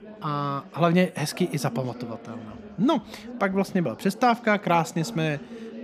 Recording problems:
chatter from many people; noticeable; throughout; 15 dB below the speech

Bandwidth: 14.5 kHz